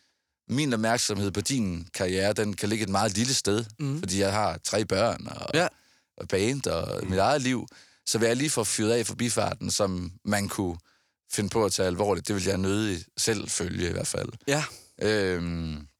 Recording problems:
none

